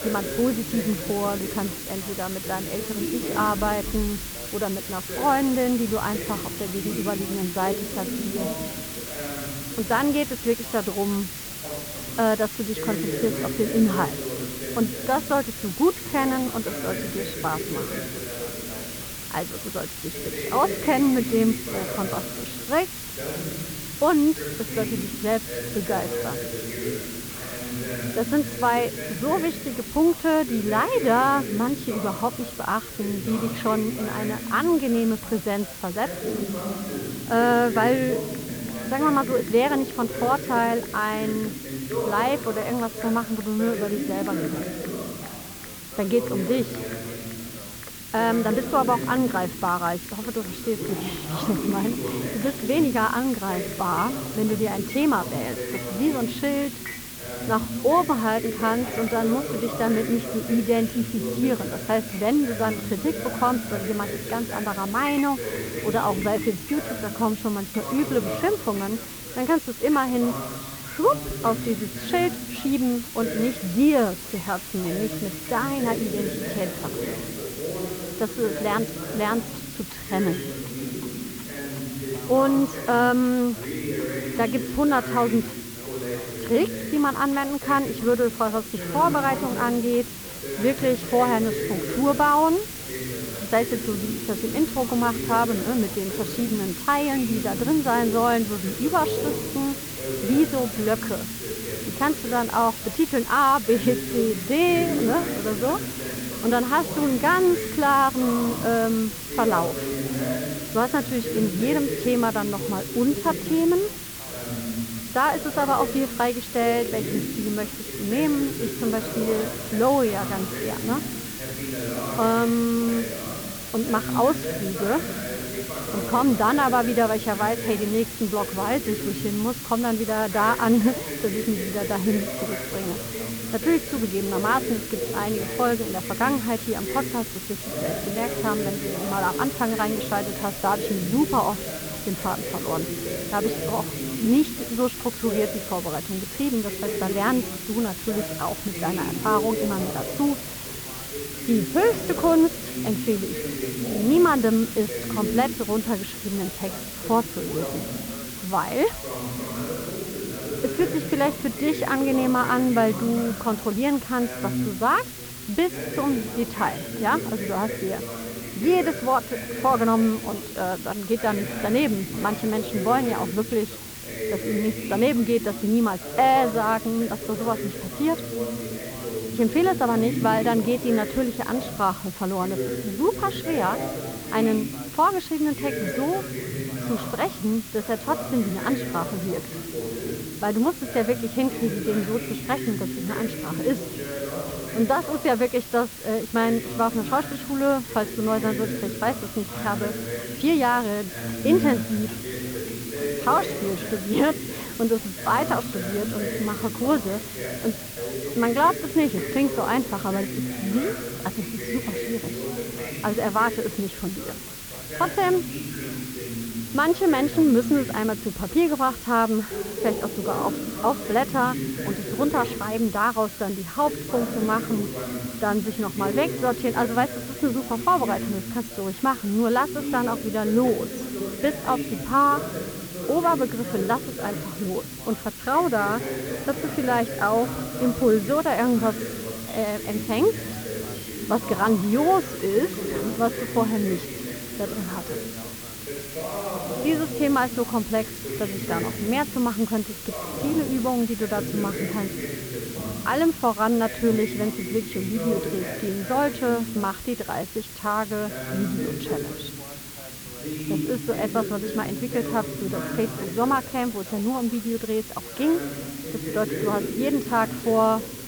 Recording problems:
muffled; very; fading above 2 kHz
background chatter; loud; throughout; 2 voices, 8 dB below the speech
hiss; loud; throughout; 9 dB below the speech
household noises; faint; throughout; 25 dB below the speech

